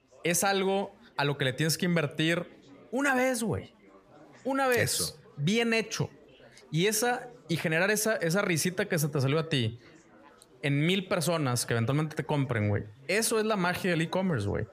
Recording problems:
chatter from many people; faint; throughout; 25 dB below the speech

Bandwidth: 14.5 kHz